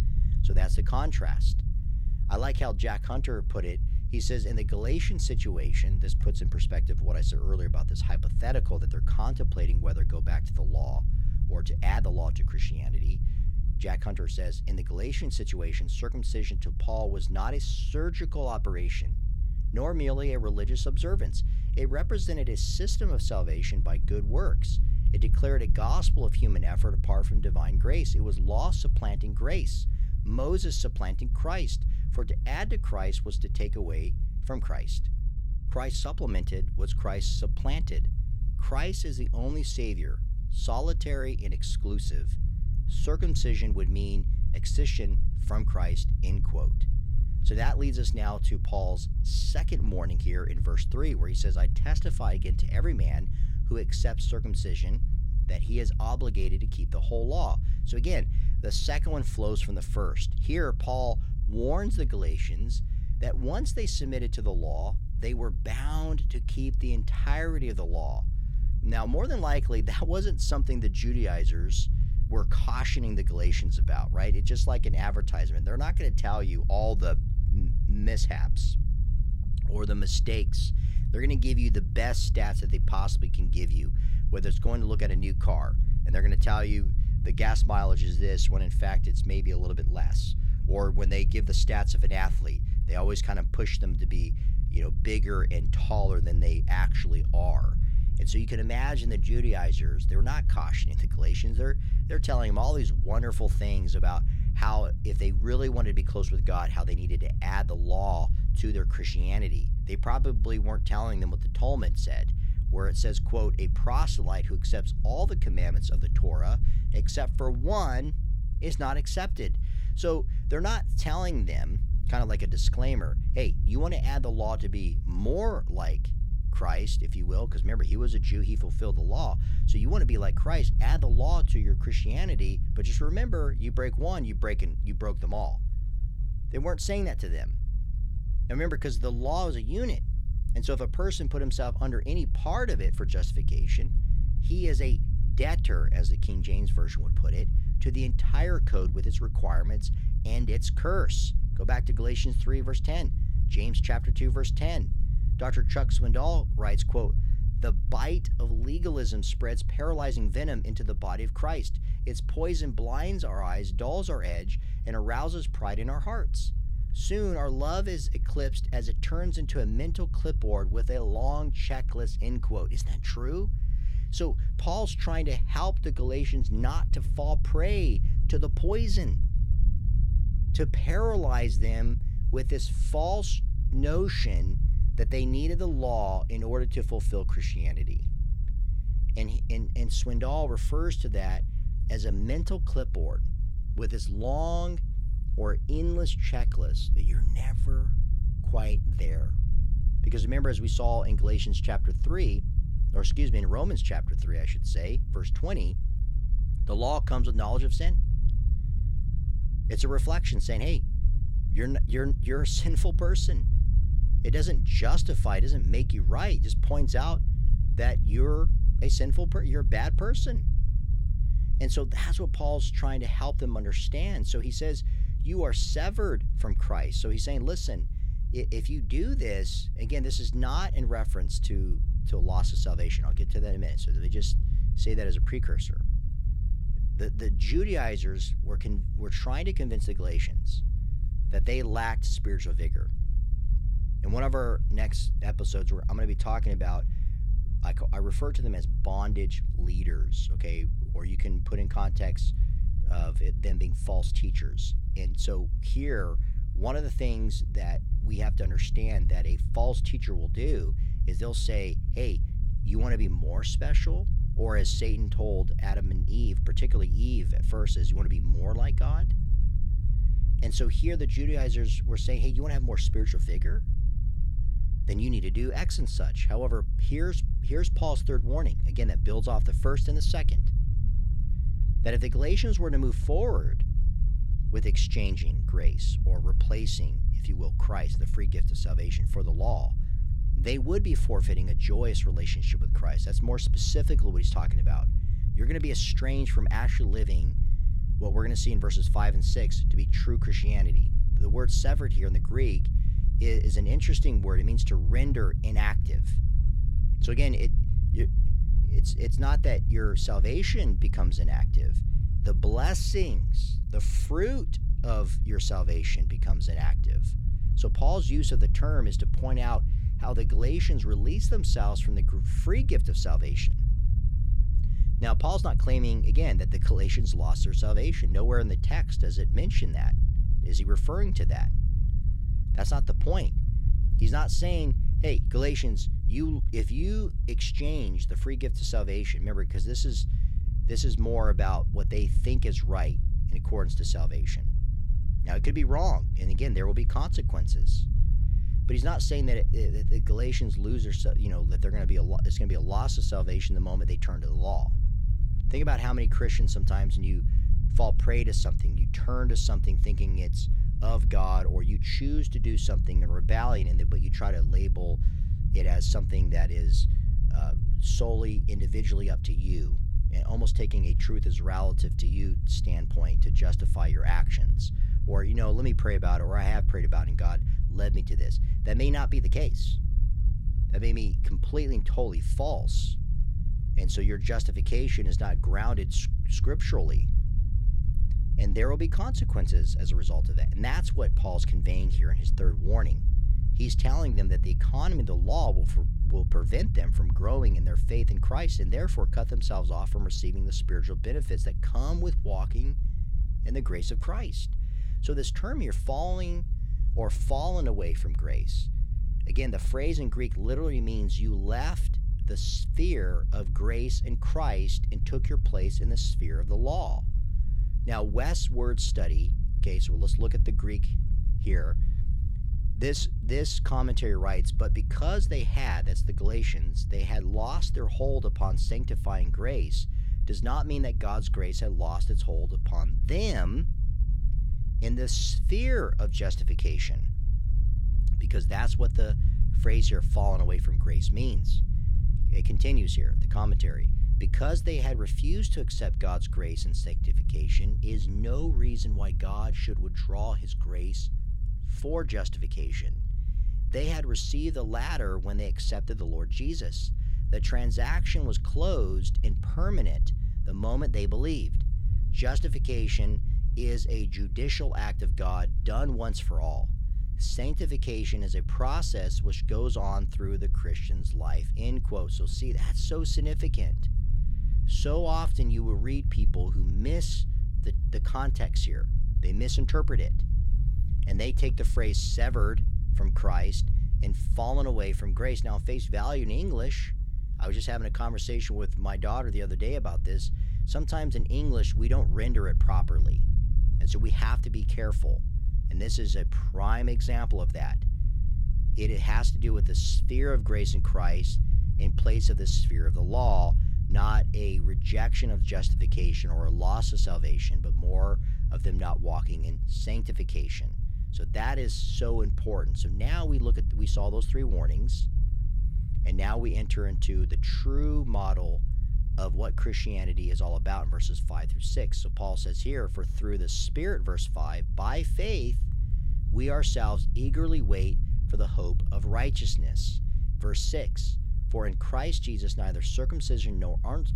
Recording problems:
low rumble; noticeable; throughout; 10 dB below the speech

